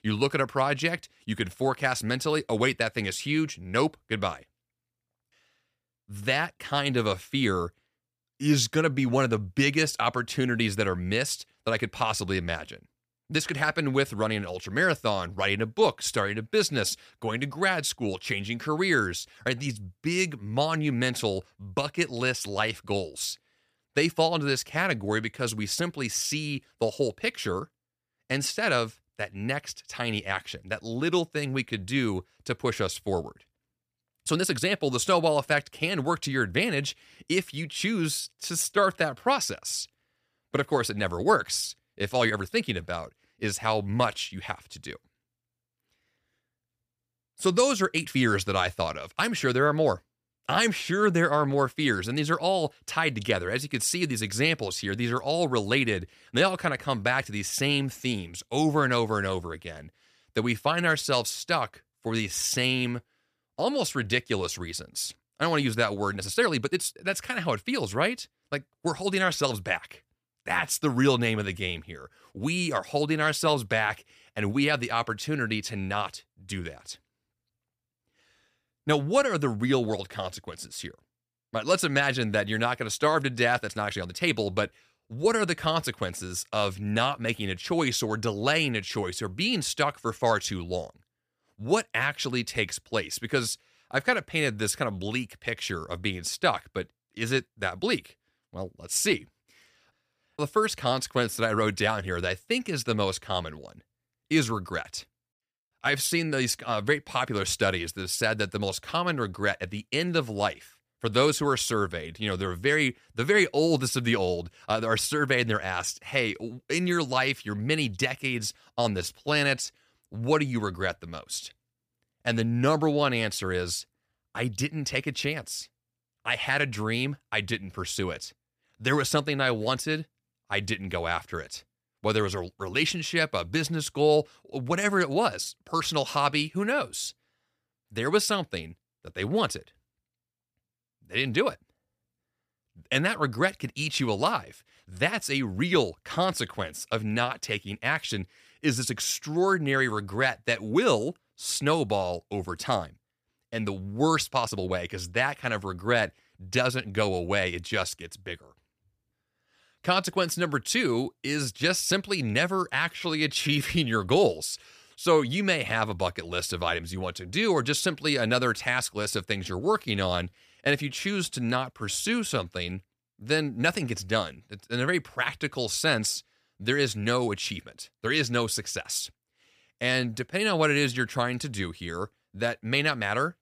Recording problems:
uneven, jittery; strongly; from 19 s to 2:52

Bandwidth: 15 kHz